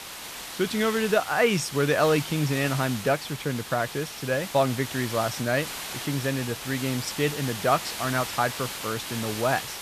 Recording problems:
hiss; loud; throughout; 8 dB below the speech

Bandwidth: 14.5 kHz